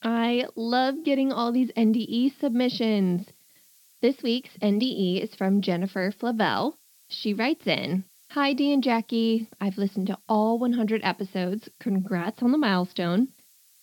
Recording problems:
high frequencies cut off; noticeable; nothing above 5.5 kHz
hiss; faint; throughout; 30 dB below the speech

